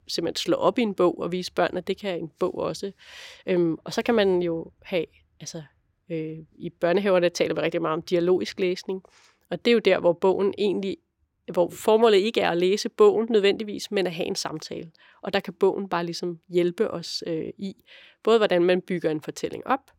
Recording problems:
none

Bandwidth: 16.5 kHz